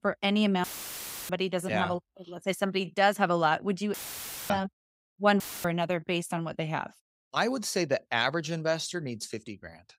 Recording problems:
audio cutting out; filled with static; at 0.5 s for 0.5 s, at 4 s for 0.5 s and at 5.5 s

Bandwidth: 15.5 kHz